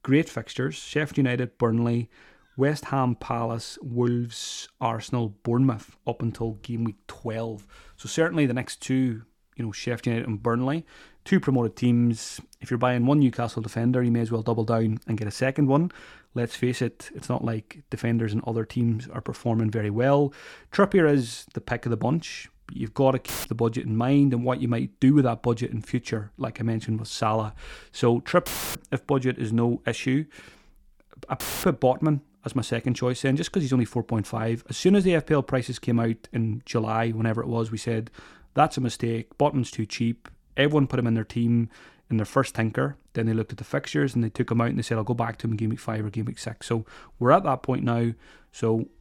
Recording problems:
audio cutting out; filled with static; at 23 s, at 28 s and at 31 s

